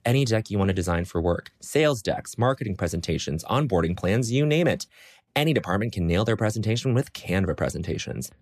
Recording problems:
none

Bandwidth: 14.5 kHz